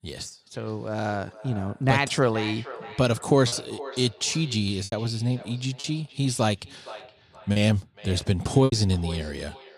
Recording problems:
echo of what is said; noticeable; throughout; 470 ms later, 15 dB below the speech
choppy; occasionally; 4% of the speech affected

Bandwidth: 14.5 kHz